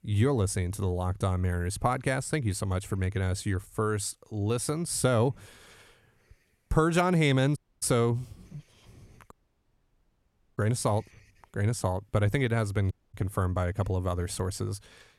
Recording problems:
audio cutting out; at 7.5 s, at 9.5 s for 1.5 s and at 13 s

